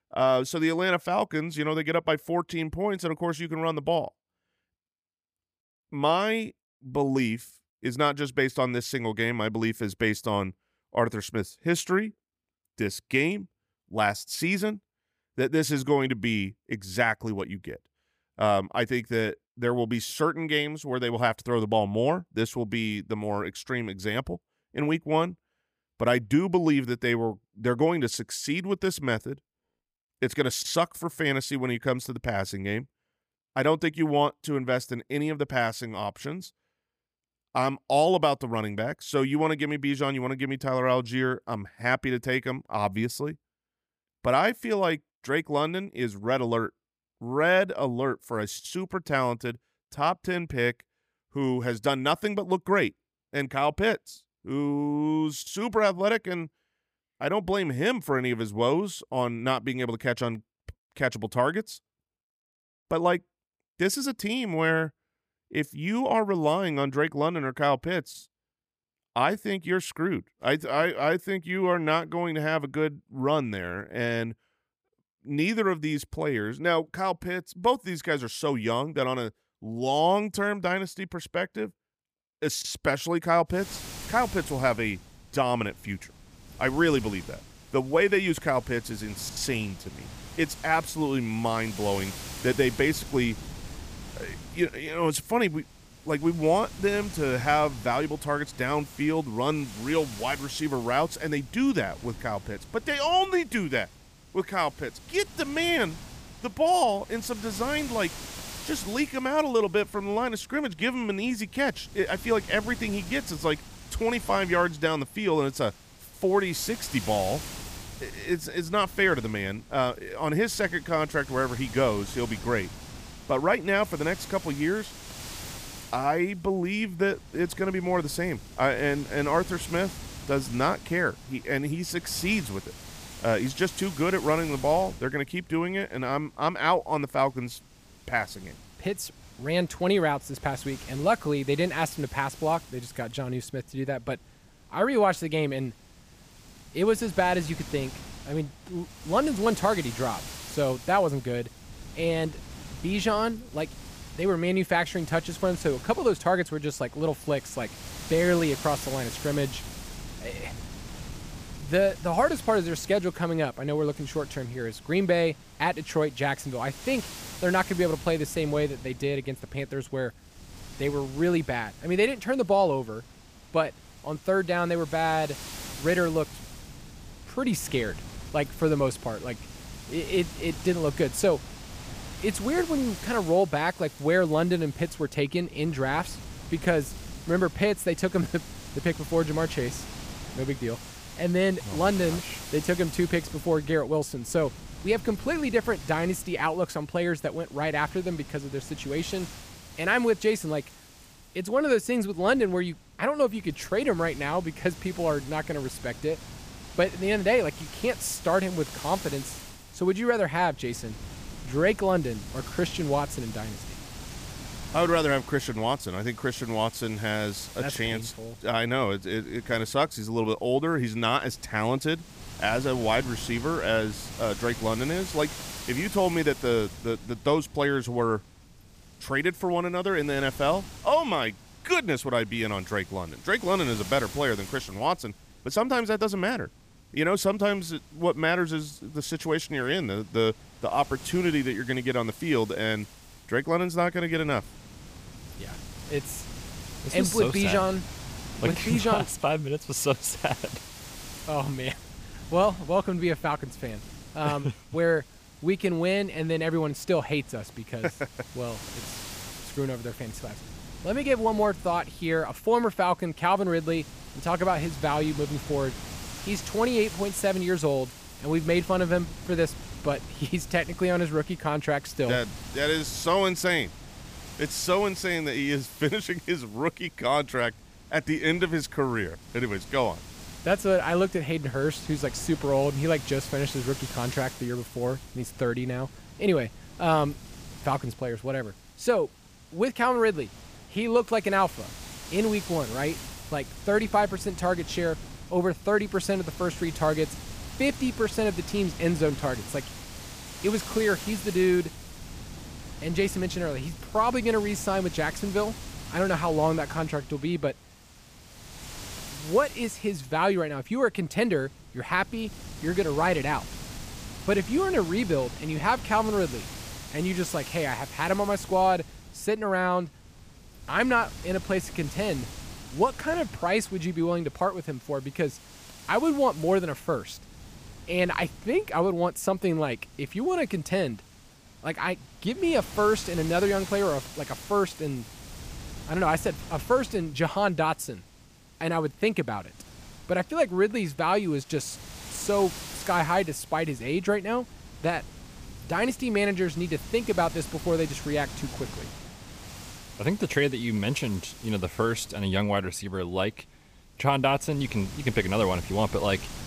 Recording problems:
wind noise on the microphone; occasional gusts; from 1:24 on; 15 dB below the speech

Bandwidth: 15 kHz